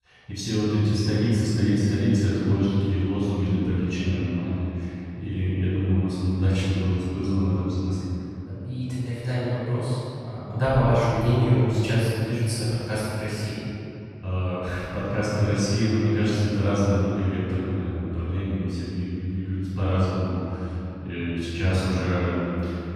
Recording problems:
room echo; strong; dies away in 2.9 s
off-mic speech; far

